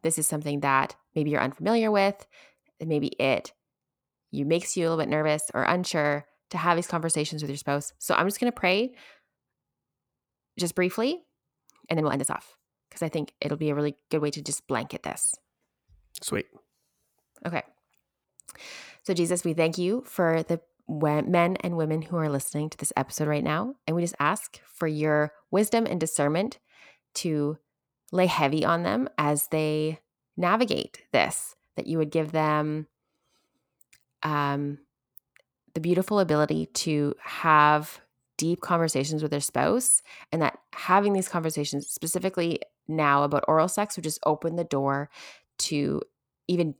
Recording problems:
uneven, jittery; strongly; from 8.5 to 46 s

